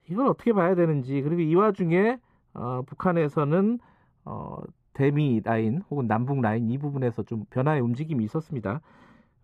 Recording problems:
muffled; slightly; fading above 2.5 kHz

